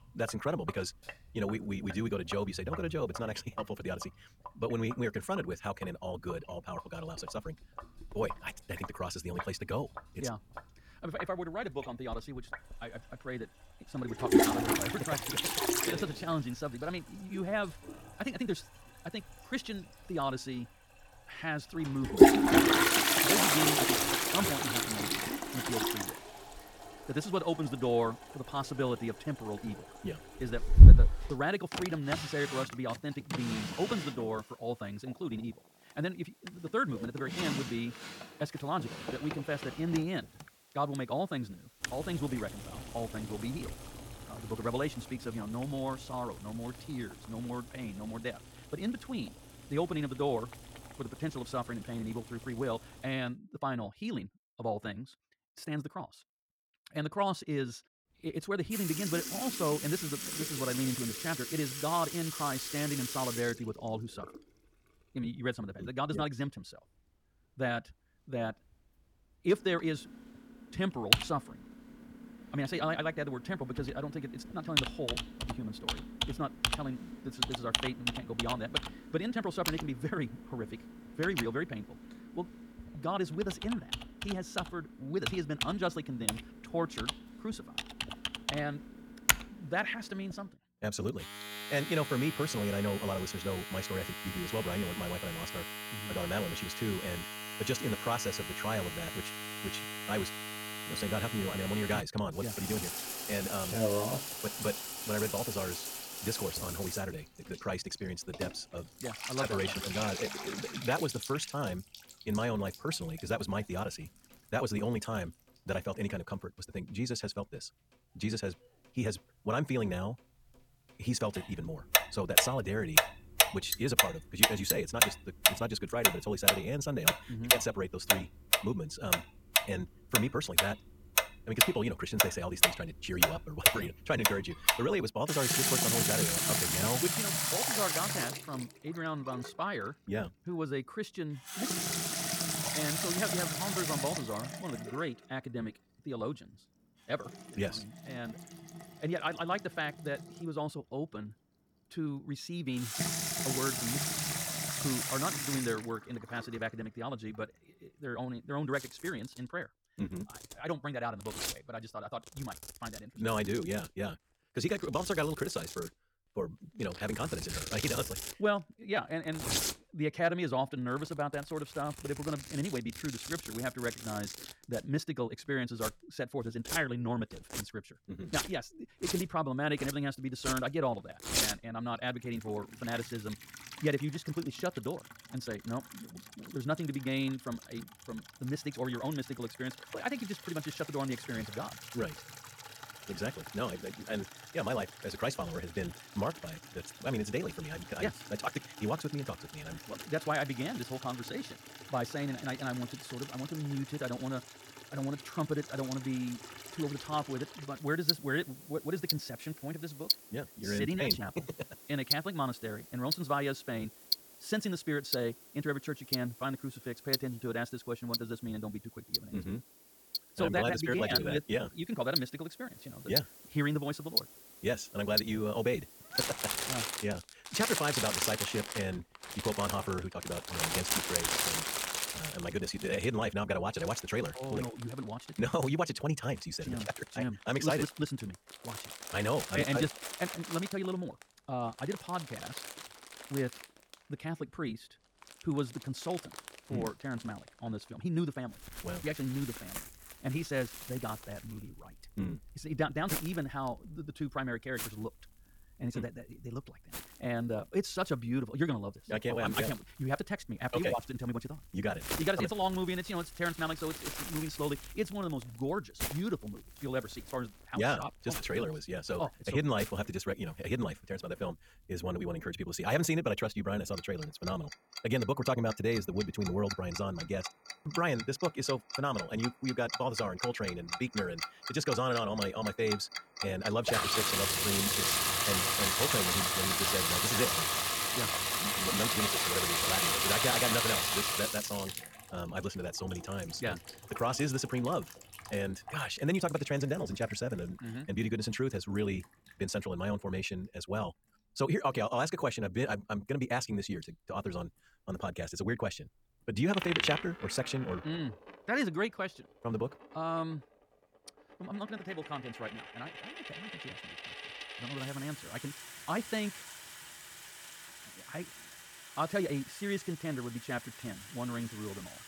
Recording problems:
wrong speed, natural pitch; too fast; 1.6 times normal speed
household noises; very loud; throughout; 4 dB above the speech

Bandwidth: 18 kHz